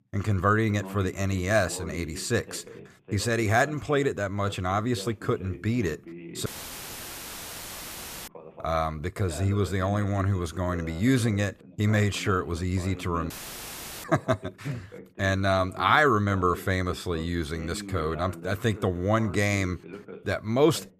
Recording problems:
voice in the background; noticeable; throughout; 15 dB below the speech
audio cutting out; filled with static; at 6.5 s for 2 s and at 13 s for 0.5 s

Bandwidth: 14.5 kHz